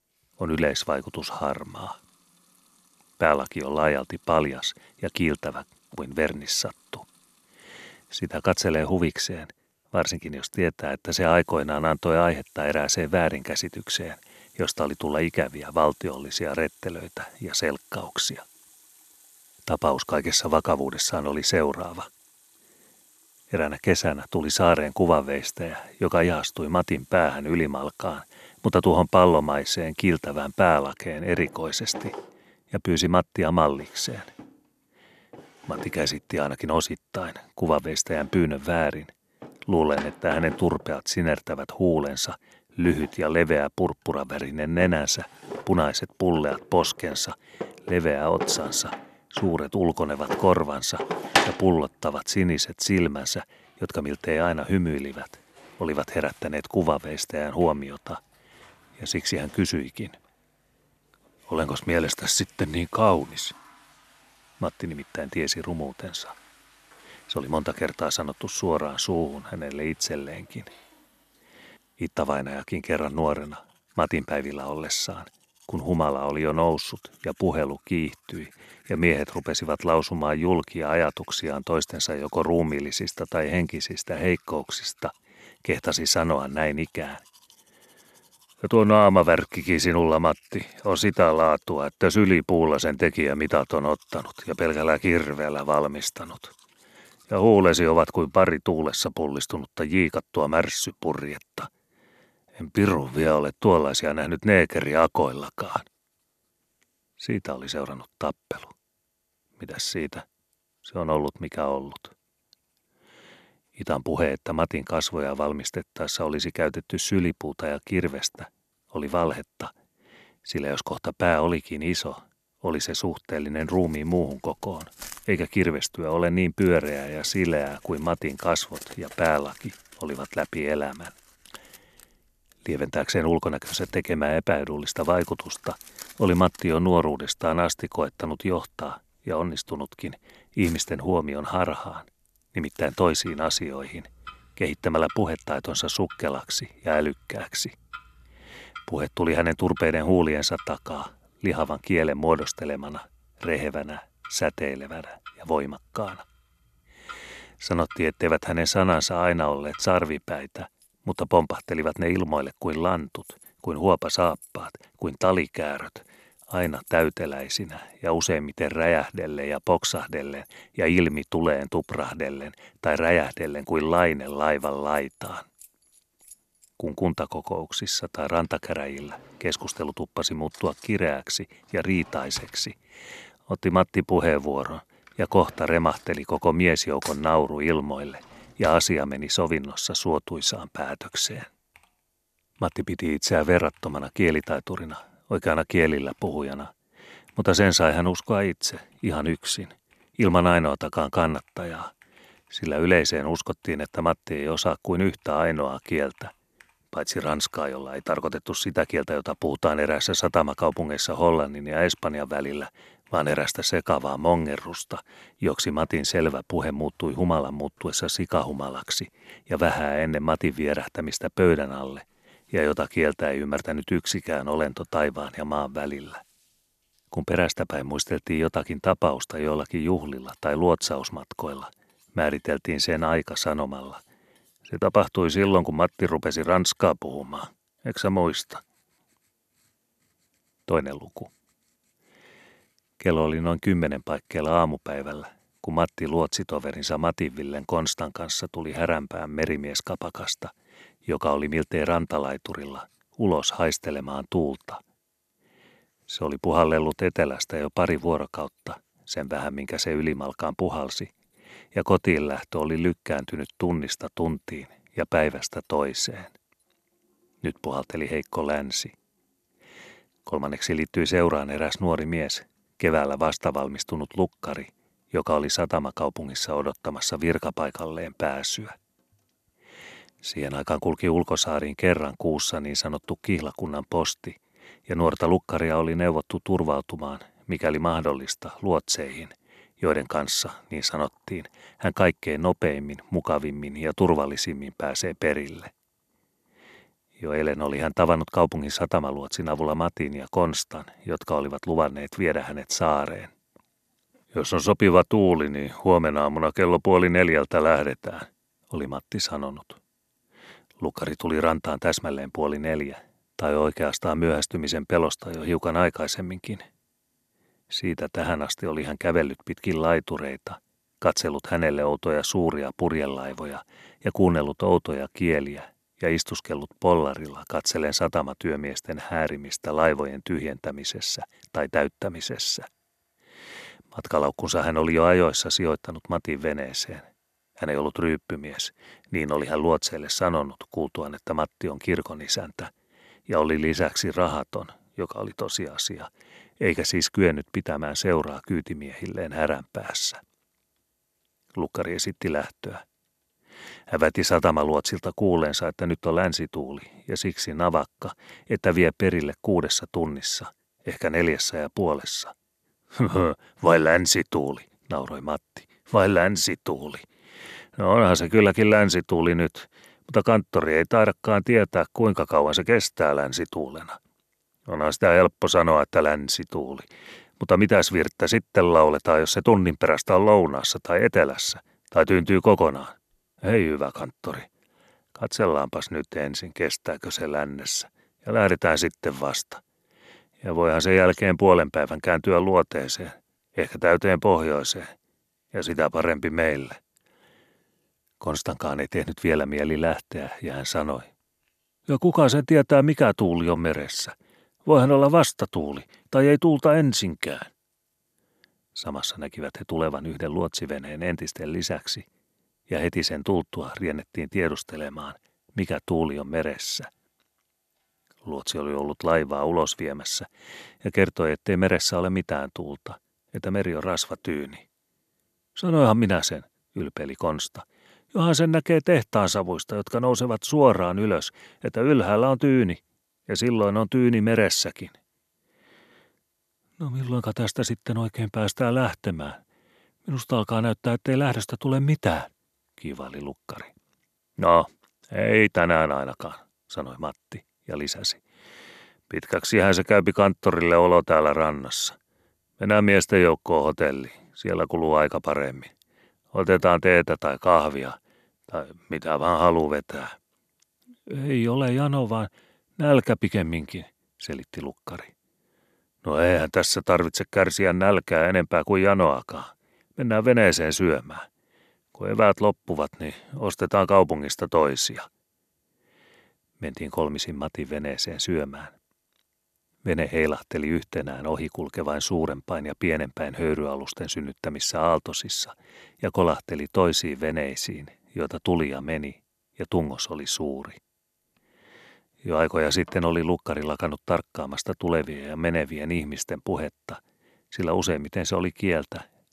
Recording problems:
household noises; noticeable; throughout; 20 dB below the speech

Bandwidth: 14 kHz